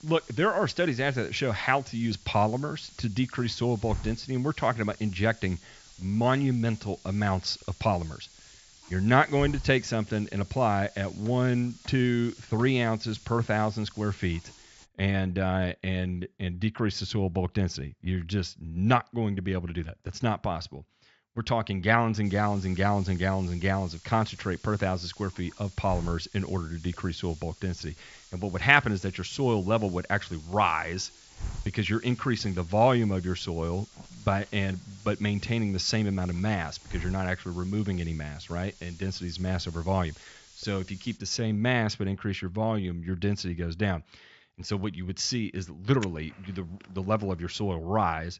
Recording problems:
high frequencies cut off; noticeable; nothing above 7.5 kHz
hiss; noticeable; until 15 s and from 22 to 41 s; 20 dB below the speech

